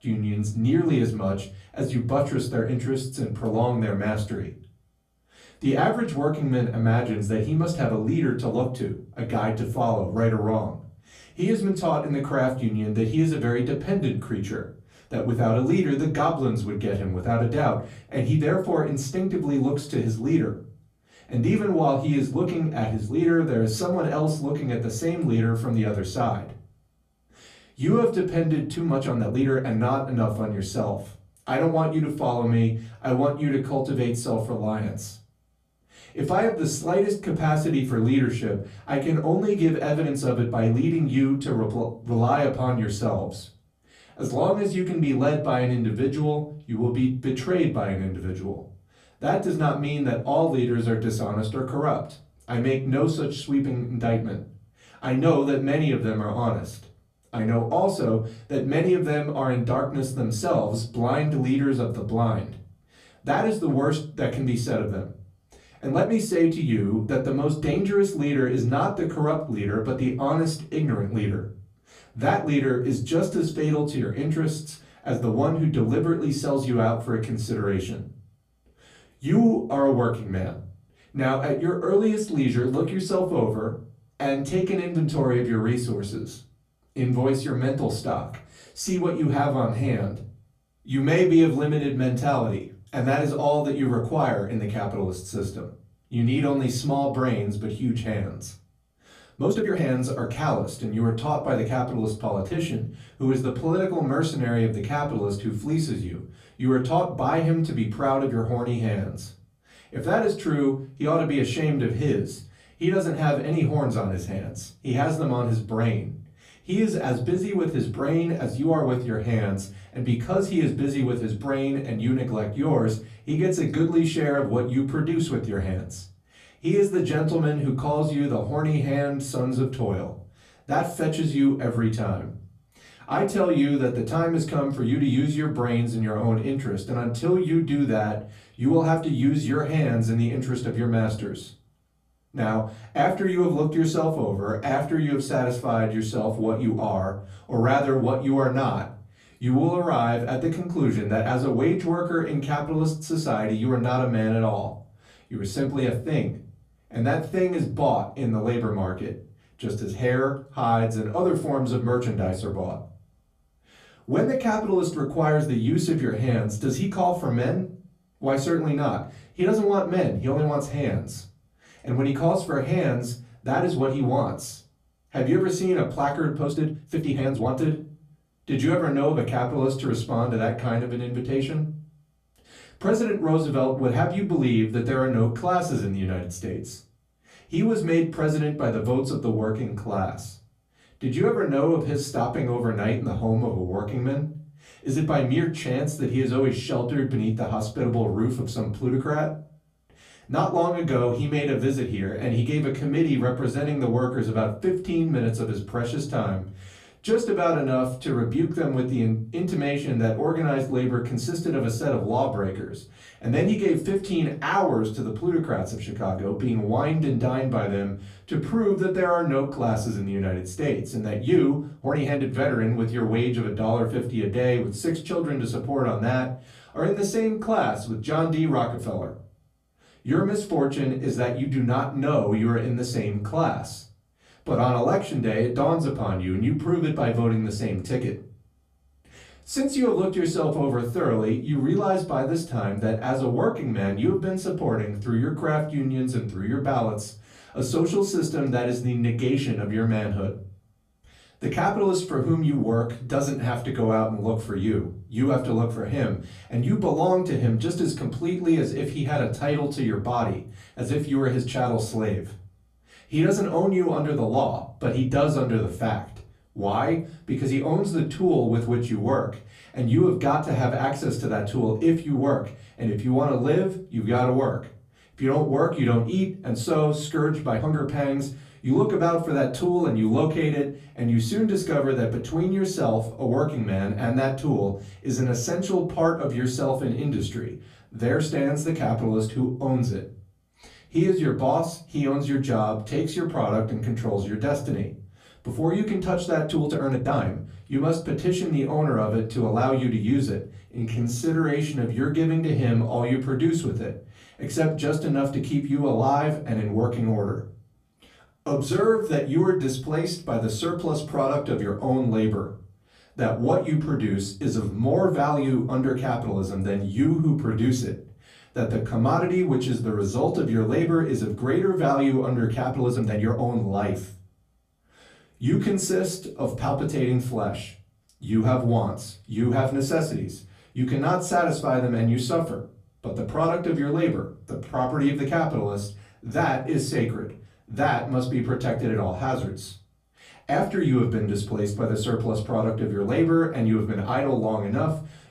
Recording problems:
off-mic speech; far
room echo; very slight; dies away in 0.3 s
uneven, jittery; strongly; from 29 s to 5:23

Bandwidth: 14.5 kHz